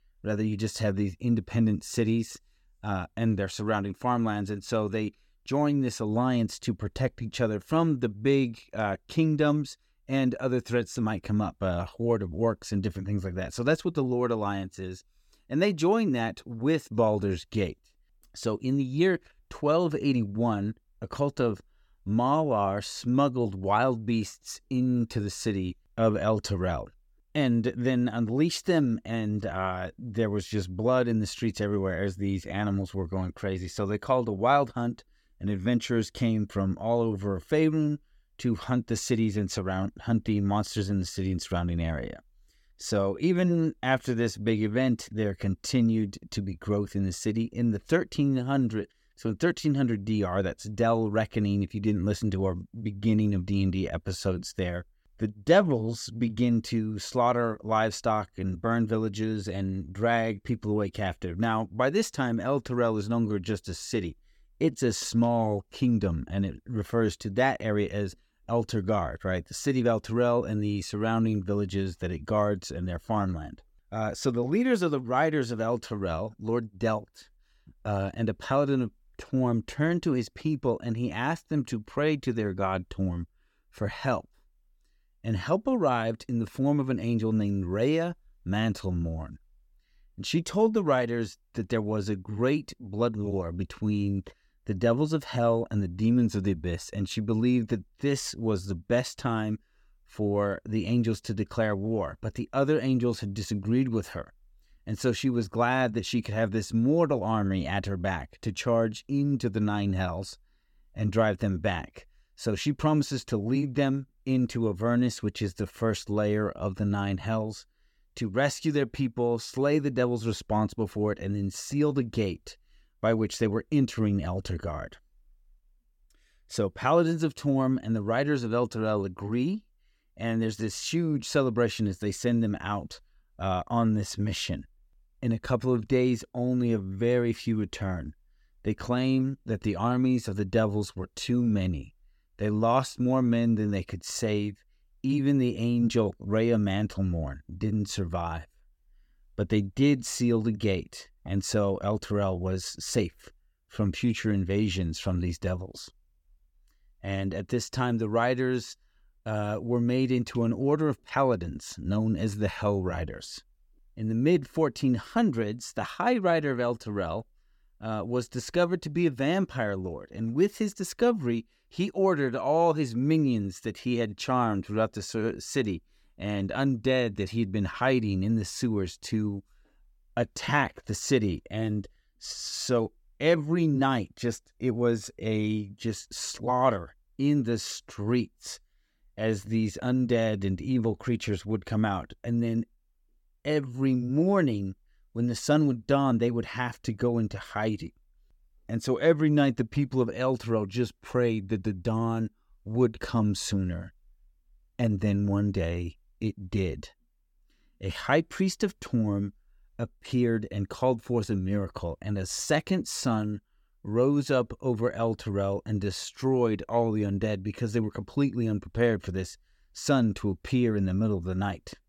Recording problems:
none

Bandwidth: 17 kHz